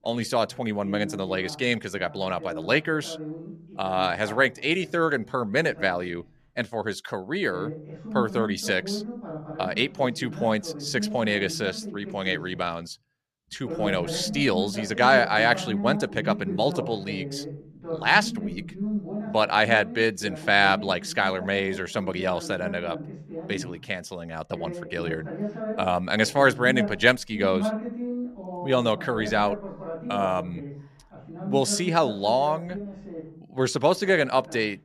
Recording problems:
voice in the background; loud; throughout; 10 dB below the speech

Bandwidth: 14.5 kHz